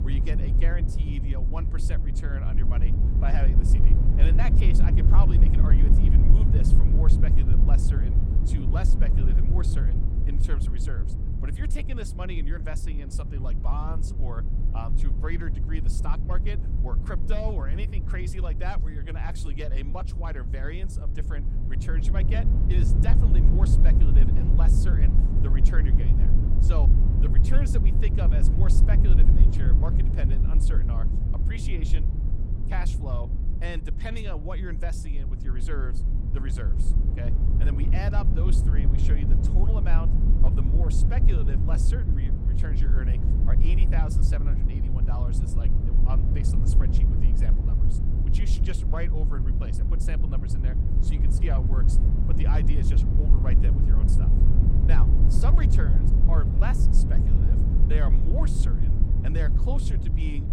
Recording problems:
low rumble; loud; throughout; 1 dB below the speech

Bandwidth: 16 kHz